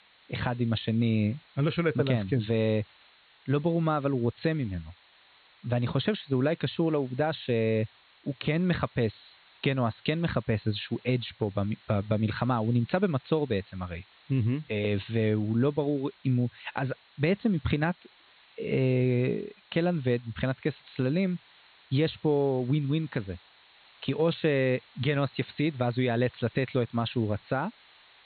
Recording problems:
high frequencies cut off; severe; nothing above 4.5 kHz
hiss; faint; throughout; 30 dB below the speech

